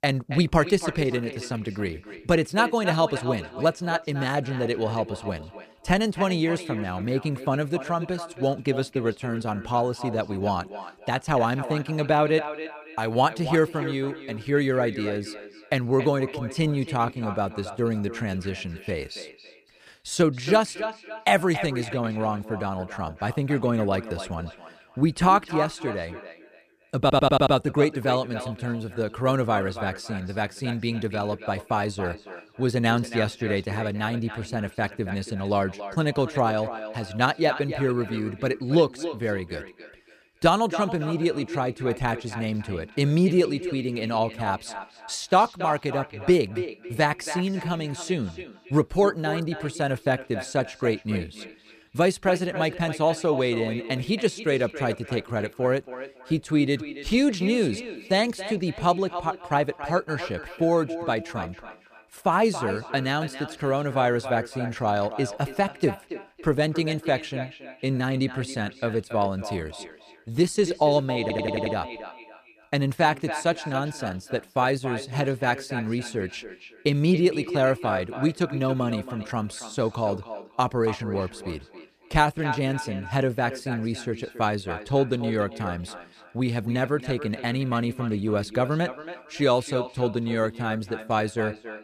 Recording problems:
echo of what is said; strong; throughout; 280 ms later, 10 dB below the speech
audio stuttering; at 27 s and at 1:11

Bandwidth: 14.5 kHz